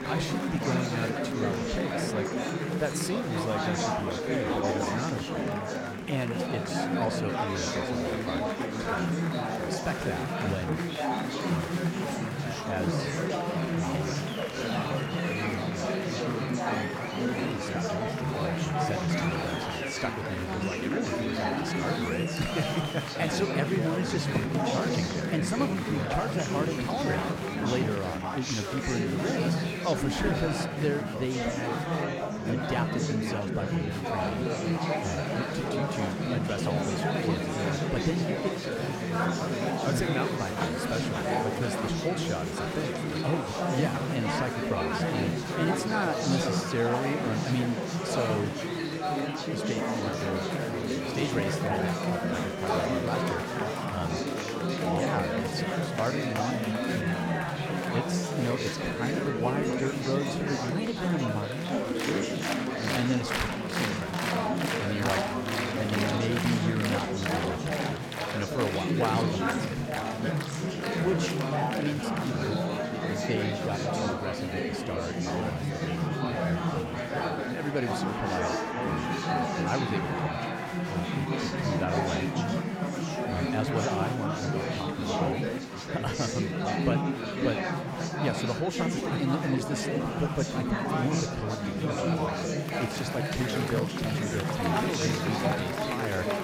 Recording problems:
murmuring crowd; very loud; throughout; 4 dB above the speech

